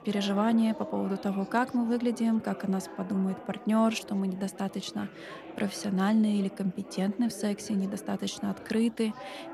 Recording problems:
chatter from many people; noticeable; throughout; 15 dB below the speech

